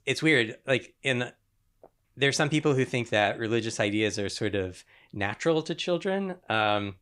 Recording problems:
none

